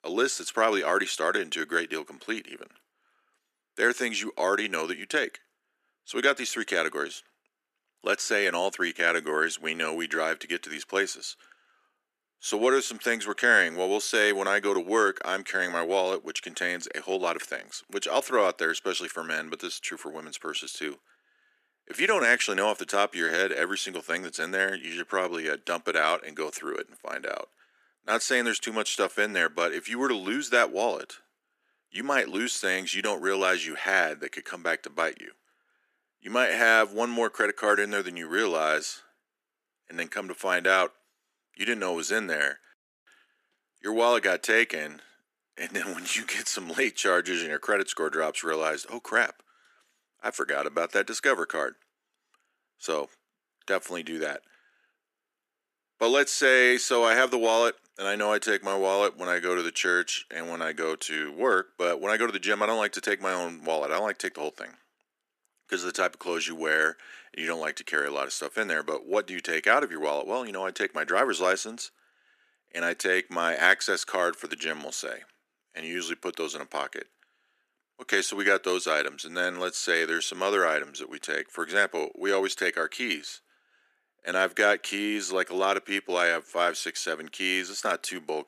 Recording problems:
thin; very; fading below 300 Hz

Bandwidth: 14.5 kHz